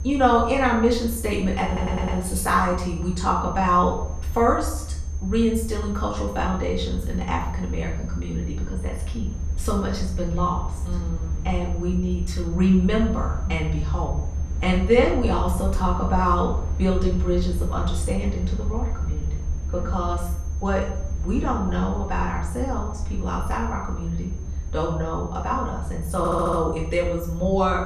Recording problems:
off-mic speech; far
room echo; noticeable; dies away in 0.5 s
high-pitched whine; faint; throughout; 6.5 kHz, 25 dB below the speech
low rumble; faint; throughout; 20 dB below the speech
audio stuttering; at 1.5 s and at 26 s

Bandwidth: 14 kHz